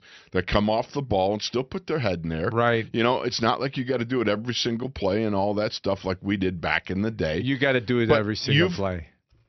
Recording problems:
high frequencies cut off; noticeable; nothing above 6 kHz

